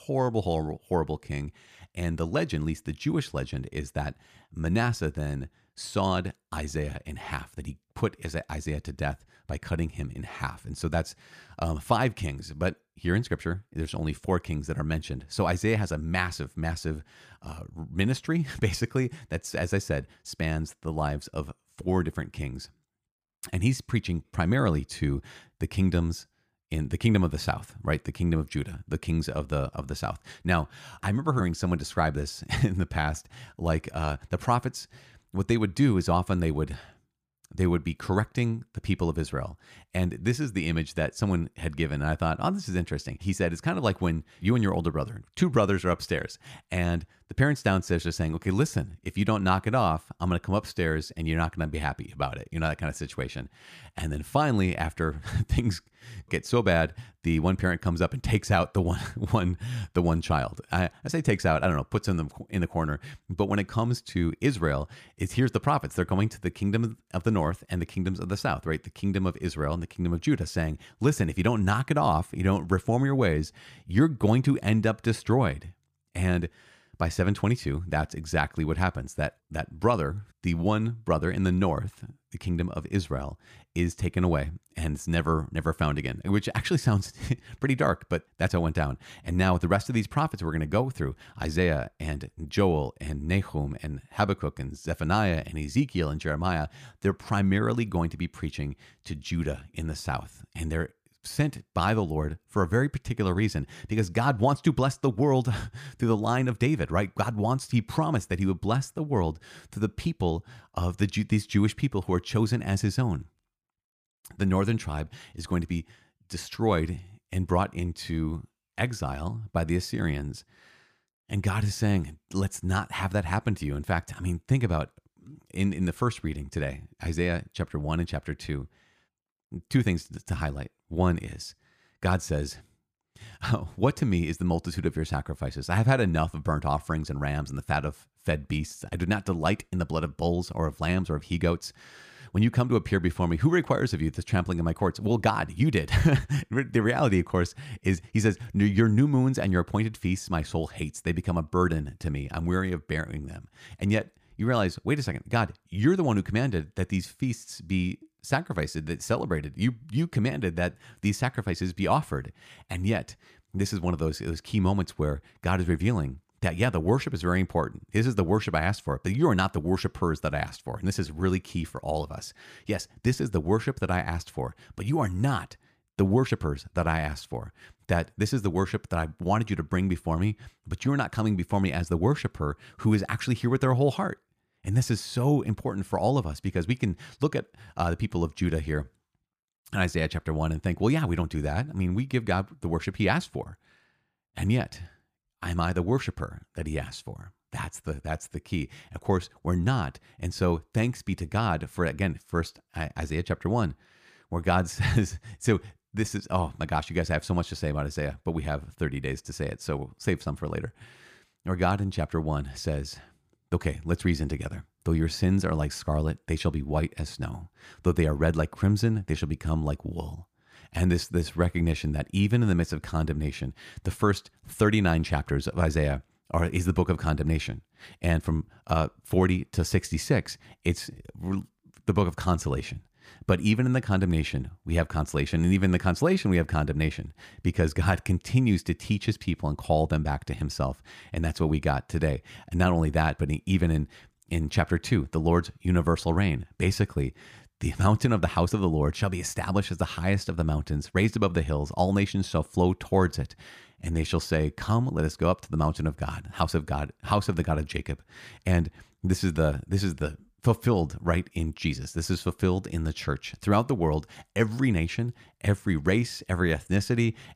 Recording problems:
none

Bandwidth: 15 kHz